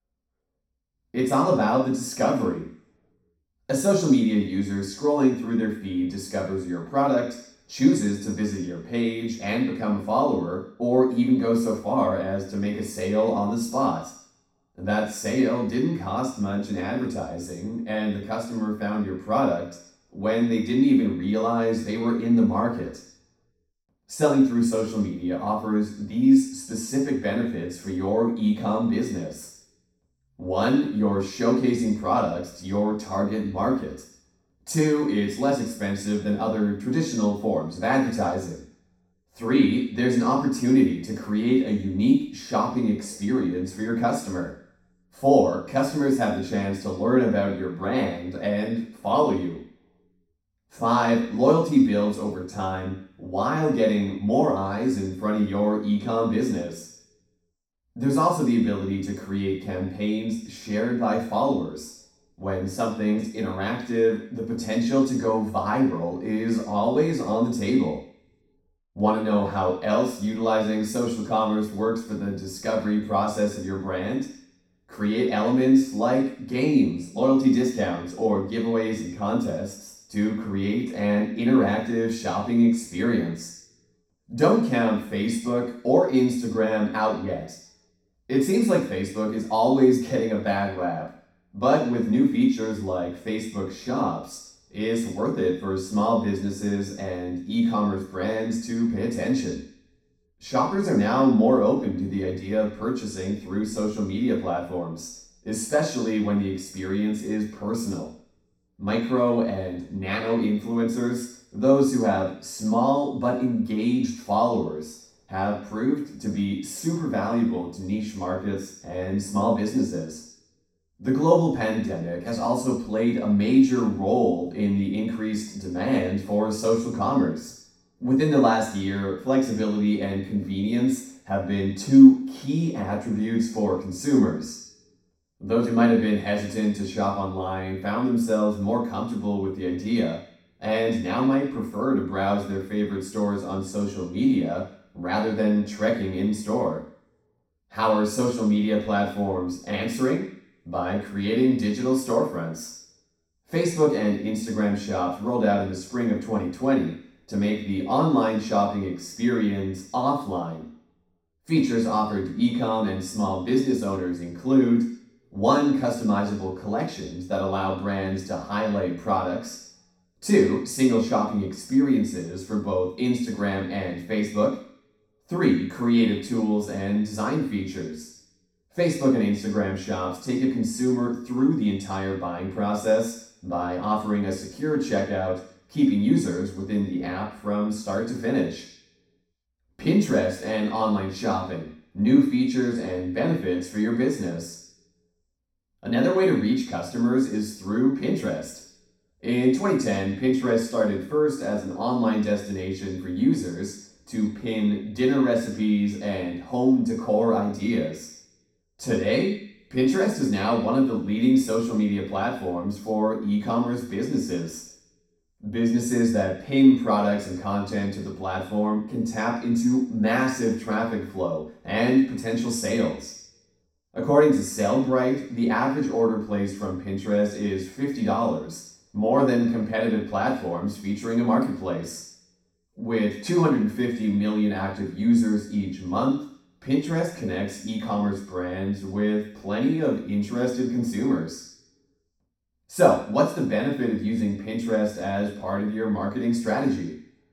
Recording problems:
off-mic speech; far
room echo; noticeable; dies away in 0.6 s

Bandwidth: 17 kHz